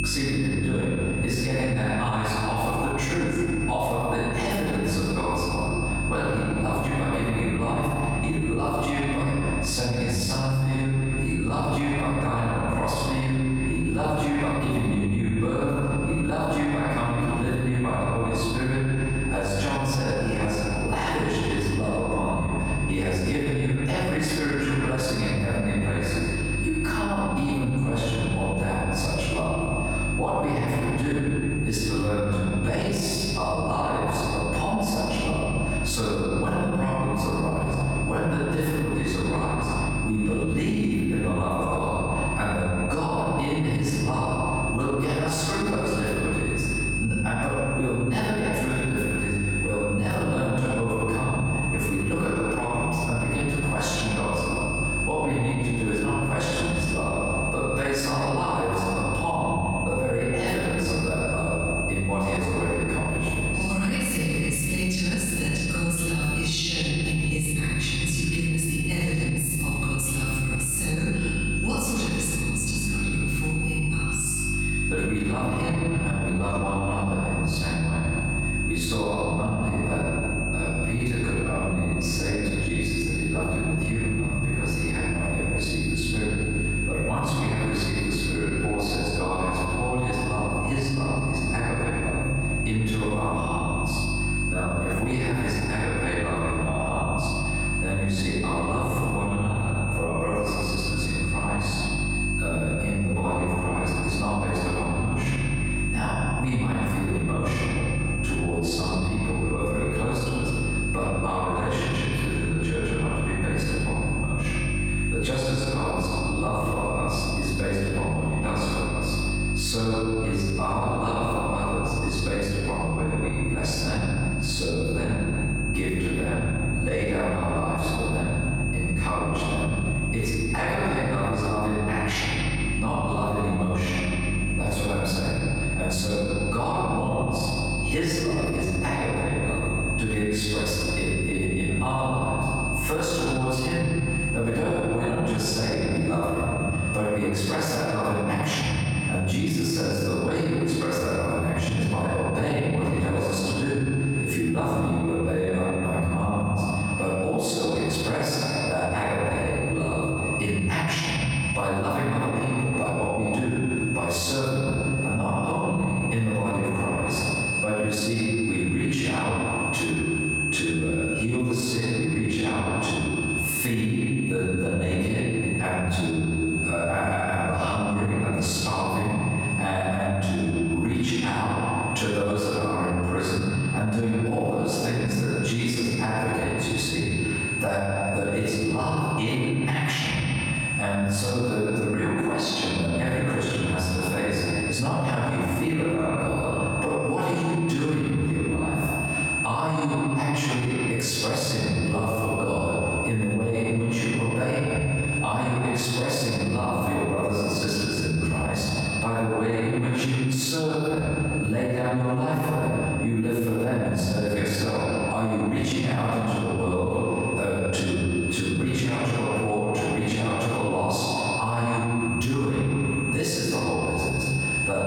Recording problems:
room echo; strong; dies away in 1.8 s
off-mic speech; far
squashed, flat; somewhat
high-pitched whine; loud; throughout; 2.5 kHz, 7 dB below the speech
electrical hum; noticeable; until 2:26; 50 Hz, 15 dB below the speech

